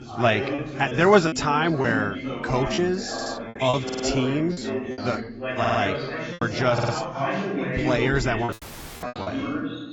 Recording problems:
garbled, watery; badly; nothing above 8 kHz
background chatter; loud; throughout; 2 voices, 5 dB below the speech
choppy; very; 8% of the speech affected
audio stuttering; 4 times, first at 3 s
audio cutting out; at 8.5 s for 0.5 s

